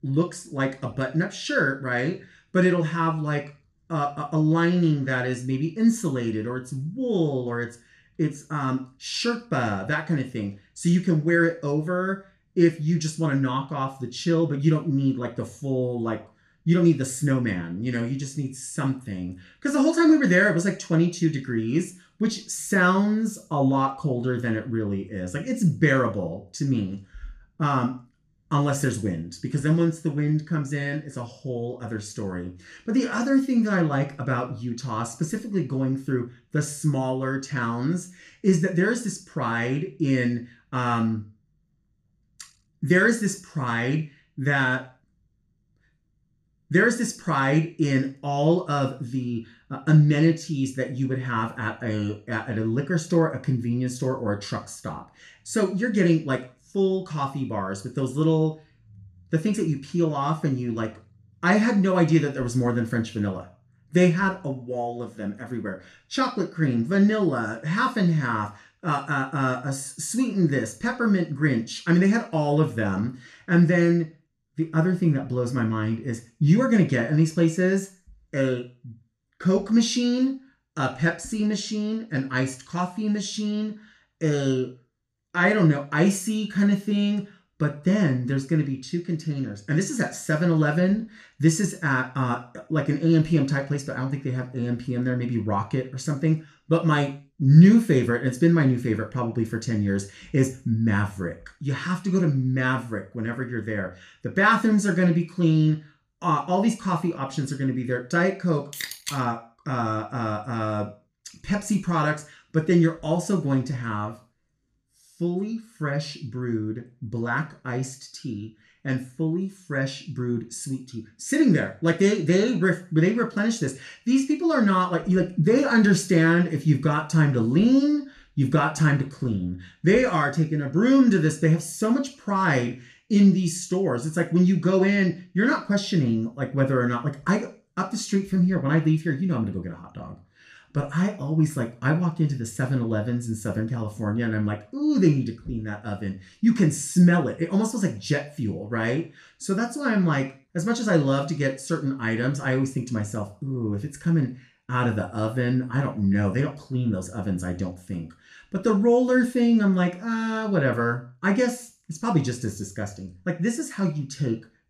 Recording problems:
room echo; very slight; dies away in 0.3 s
off-mic speech; somewhat distant

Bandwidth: 14.5 kHz